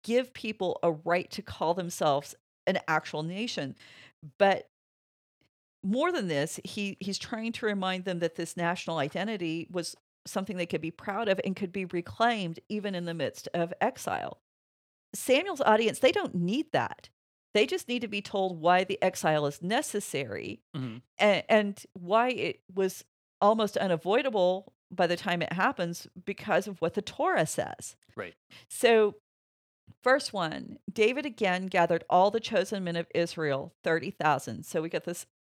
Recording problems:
none

